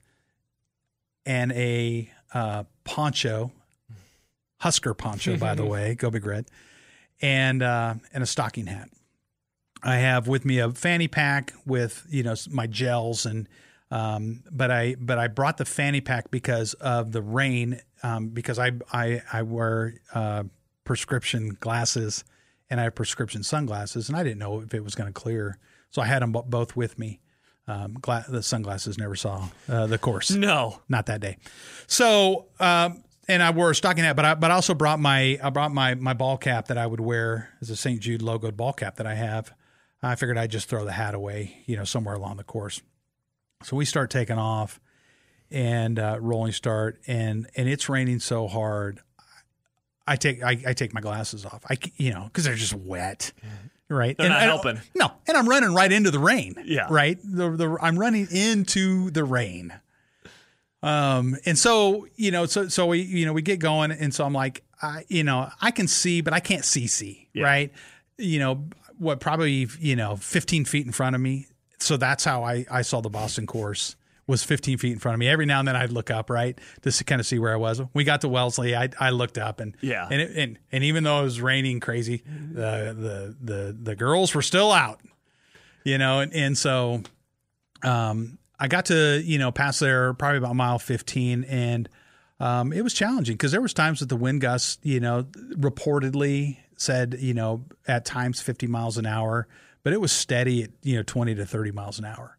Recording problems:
none

